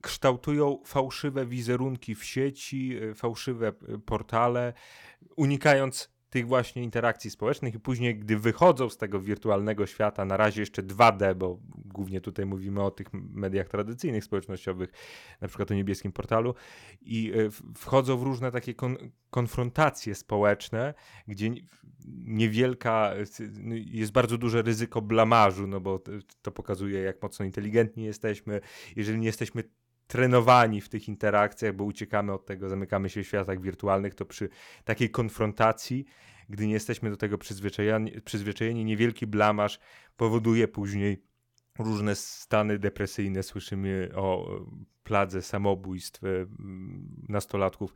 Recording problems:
none

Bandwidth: 18 kHz